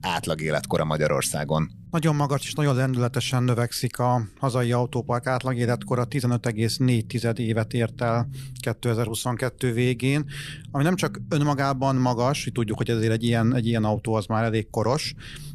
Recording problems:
low rumble; faint; throughout; 25 dB below the speech

